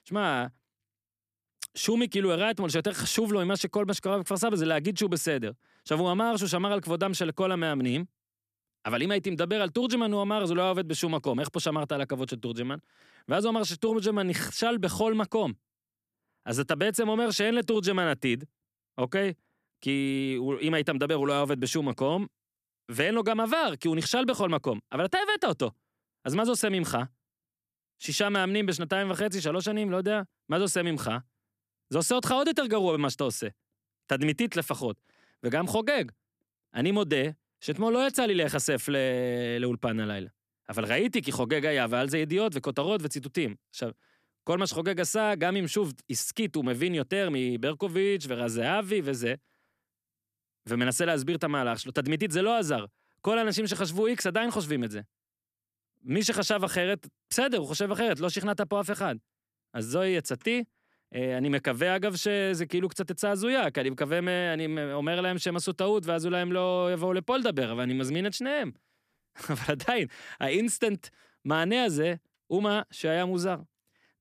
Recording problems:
none

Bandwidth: 14.5 kHz